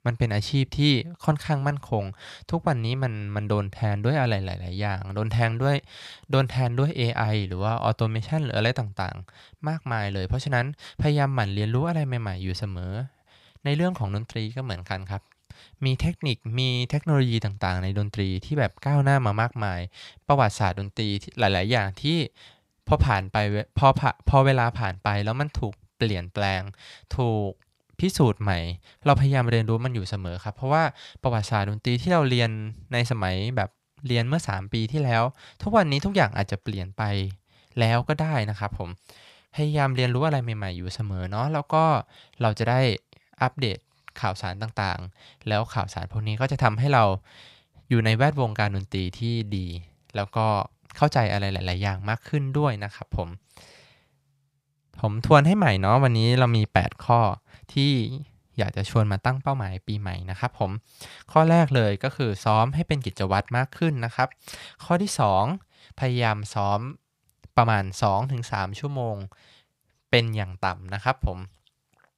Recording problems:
none

